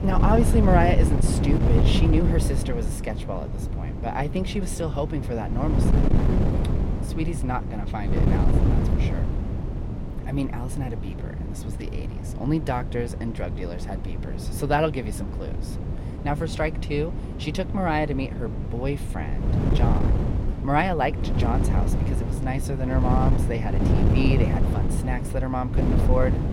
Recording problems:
wind noise on the microphone; heavy; 6 dB below the speech

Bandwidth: 16.5 kHz